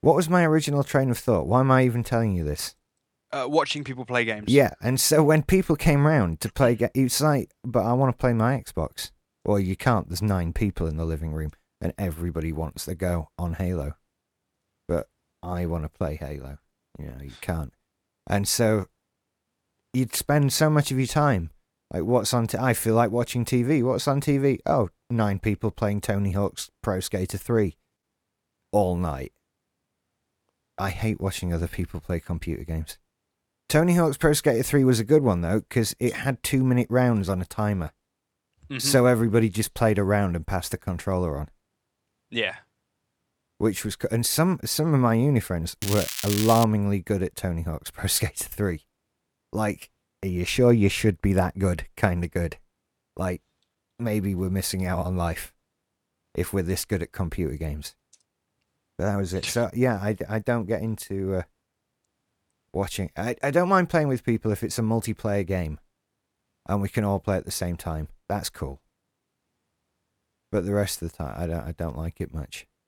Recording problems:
crackling; loud; at 46 s; 5 dB below the speech

